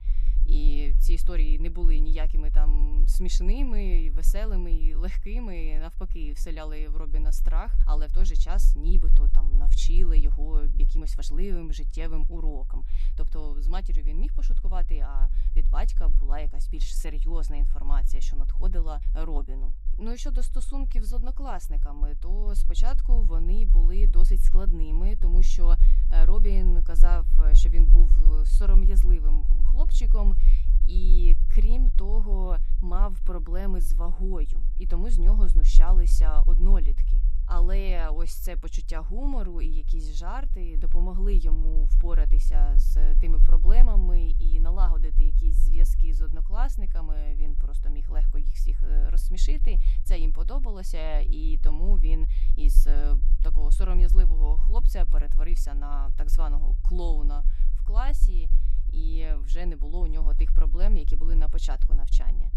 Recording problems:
low rumble; noticeable; throughout; 15 dB below the speech

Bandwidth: 14.5 kHz